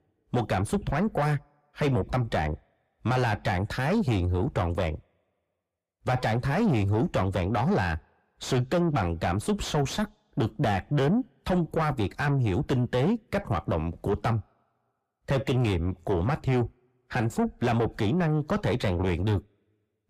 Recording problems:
distortion; heavy; 6 dB below the speech

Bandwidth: 15 kHz